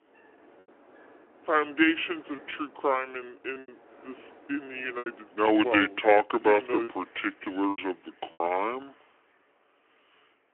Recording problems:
wrong speed and pitch; too slow and too low; 0.7 times normal speed
phone-call audio
wind in the background; faint; throughout; 25 dB below the speech
choppy; very; 6% of the speech affected

